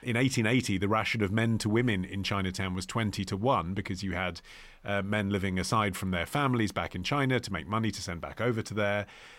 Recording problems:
none

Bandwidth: 16 kHz